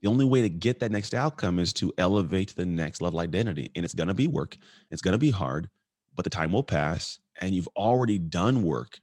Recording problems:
uneven, jittery; strongly; from 1 to 8 s

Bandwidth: 16.5 kHz